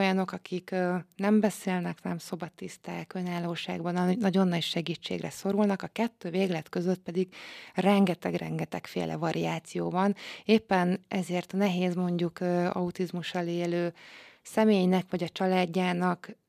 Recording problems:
abrupt cut into speech; at the start

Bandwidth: 14.5 kHz